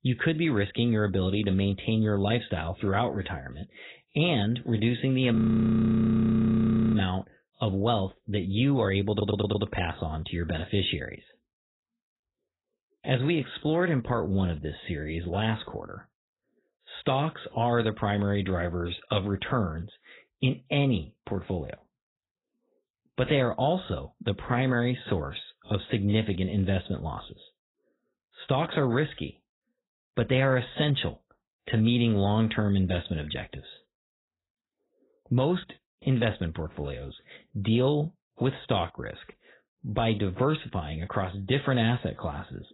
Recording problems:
garbled, watery; badly; nothing above 4 kHz
audio freezing; at 5.5 s for 1.5 s
audio stuttering; at 9 s

